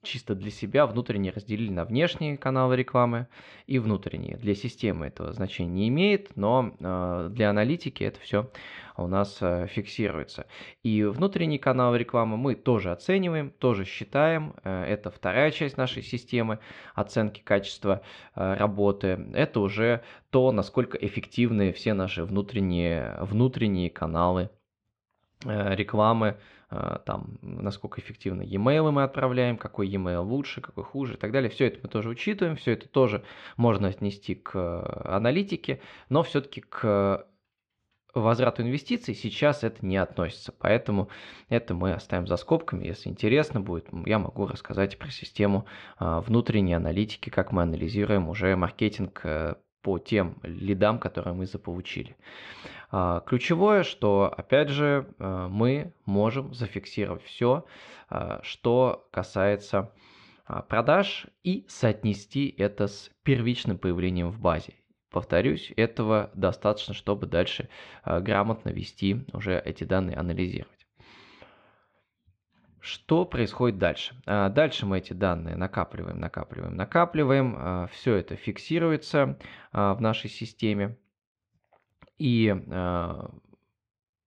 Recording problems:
muffled; slightly; fading above 3 kHz

